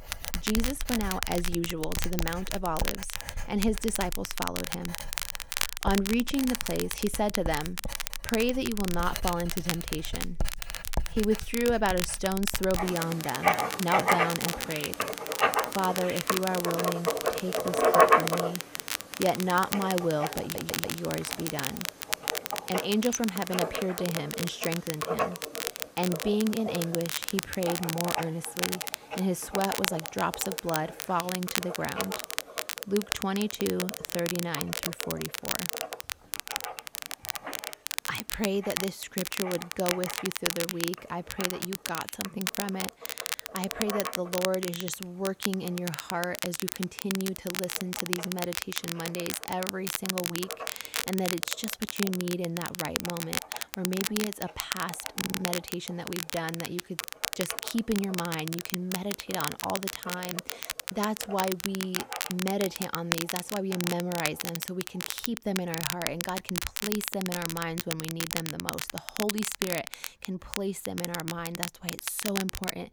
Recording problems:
household noises; loud; throughout; 2 dB below the speech
crackle, like an old record; loud; 2 dB below the speech
audio stuttering; at 20 s and at 55 s

